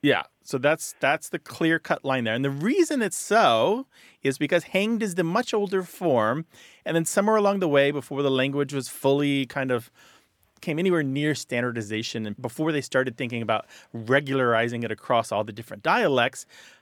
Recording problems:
none

